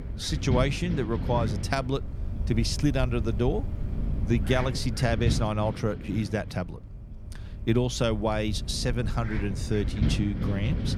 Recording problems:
wind noise on the microphone; occasional gusts; 10 dB below the speech

